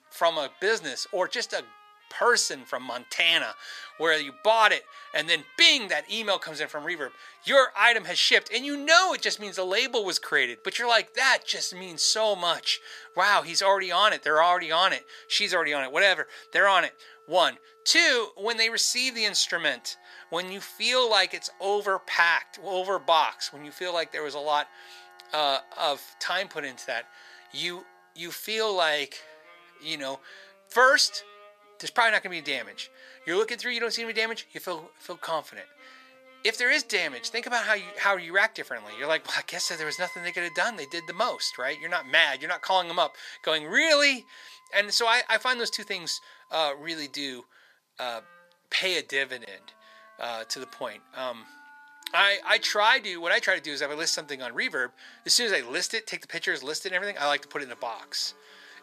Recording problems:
thin; very; fading below 650 Hz
background music; faint; throughout; 25 dB below the speech

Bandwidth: 14.5 kHz